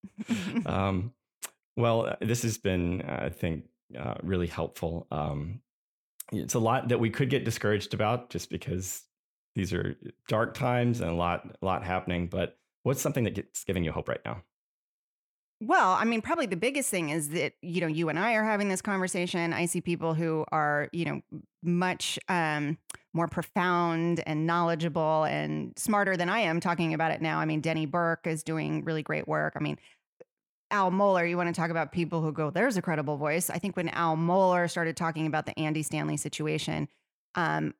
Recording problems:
uneven, jittery; strongly; from 1.5 to 35 s

